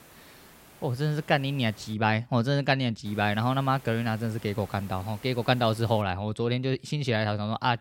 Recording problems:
hiss; faint; until 2 s and from 3 to 6 s; 20 dB below the speech

